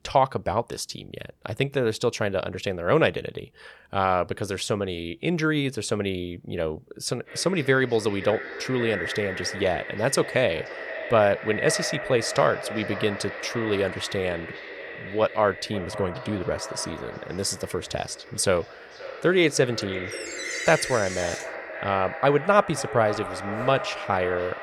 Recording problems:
echo of what is said; strong; from 7 s on; 520 ms later, 9 dB below the speech
door banging; noticeable; from 20 to 21 s; peak 7 dB below the speech

